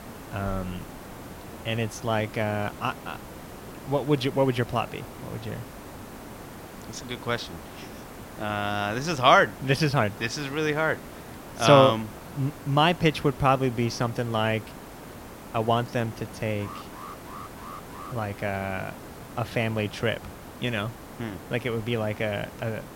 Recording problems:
hiss; noticeable; throughout; 15 dB below the speech
alarm; faint; from 17 to 18 s; peak 15 dB below the speech

